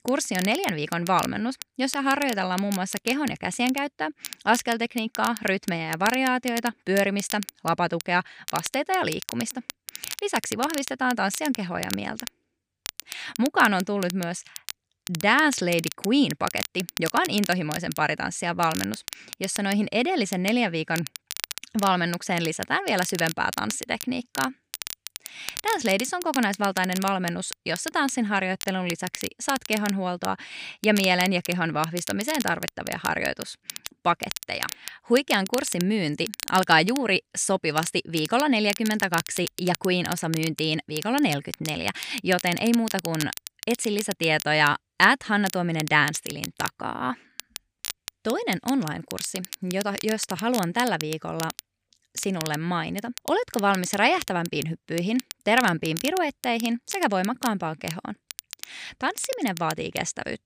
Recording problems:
crackle, like an old record; noticeable; 10 dB below the speech

